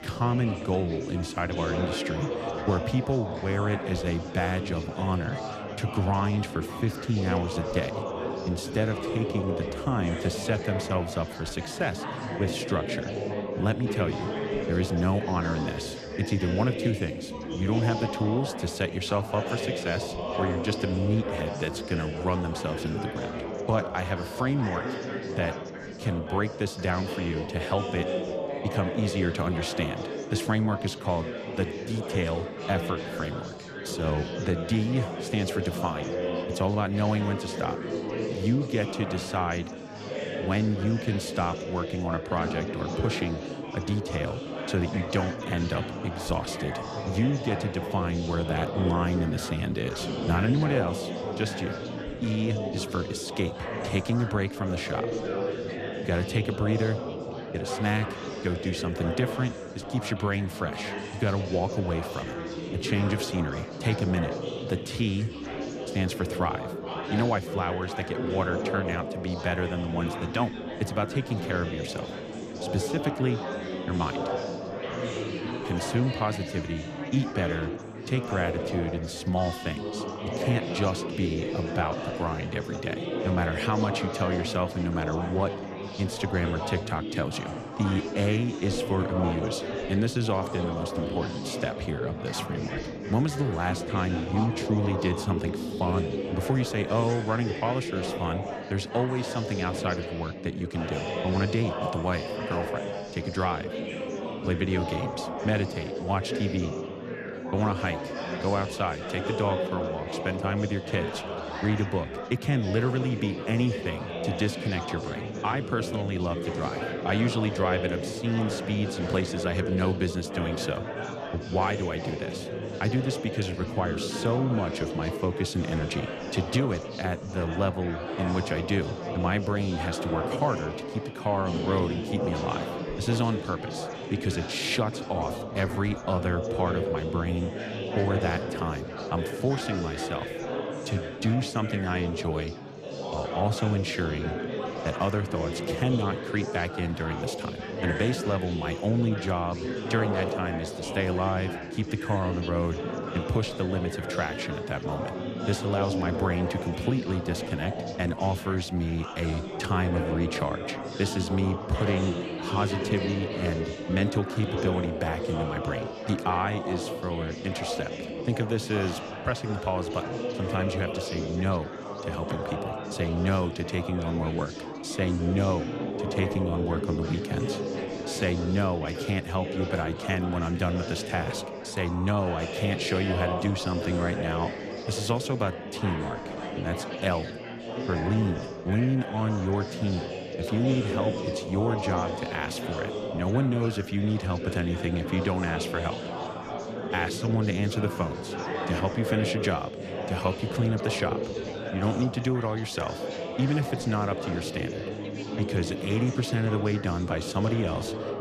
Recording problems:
chatter from many people; loud; throughout; 4 dB below the speech

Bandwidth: 14.5 kHz